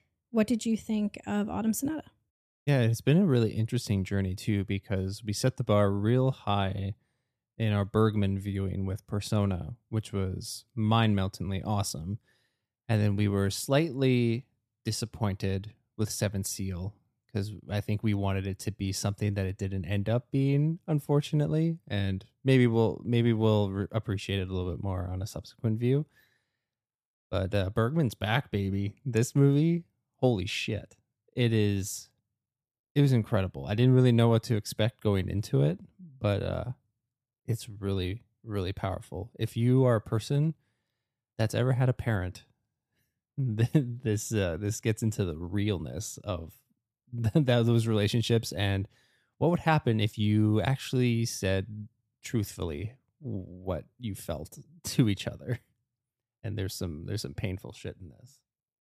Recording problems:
none

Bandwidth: 14.5 kHz